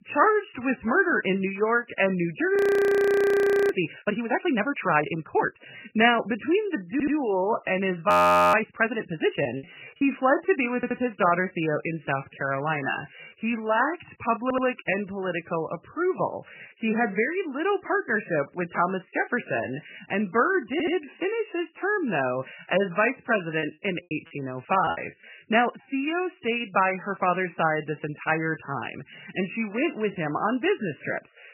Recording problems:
garbled, watery; badly; nothing above 16 kHz
audio freezing; at 2.5 s for 1 s and at 8 s
audio stuttering; 4 times, first at 7 s
choppy; very; at 9.5 s and from 24 to 25 s; 9% of the speech affected

